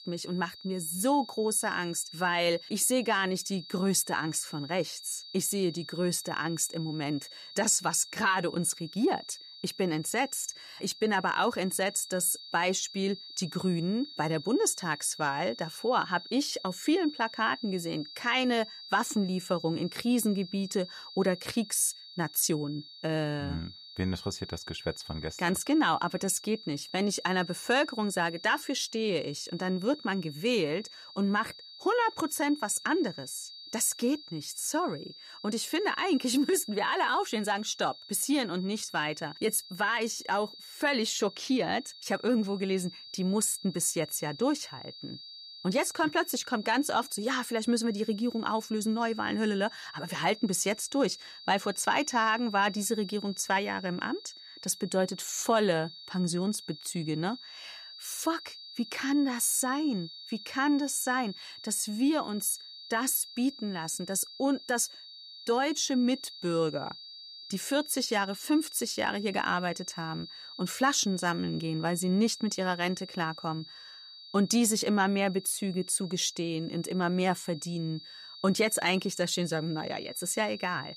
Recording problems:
high-pitched whine; noticeable; throughout; 4.5 kHz, 15 dB below the speech

